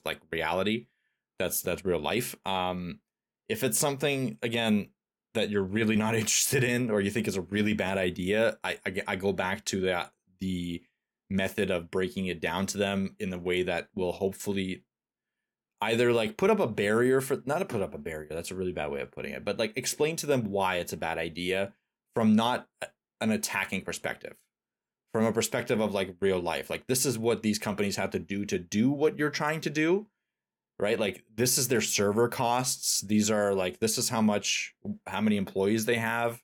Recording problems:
none

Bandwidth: 18 kHz